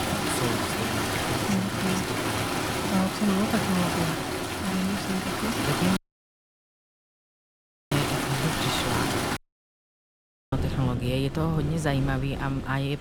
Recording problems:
rain or running water; very loud; throughout; 1 dB above the speech
audio cutting out; at 6 s for 2 s and at 9.5 s for 1 s

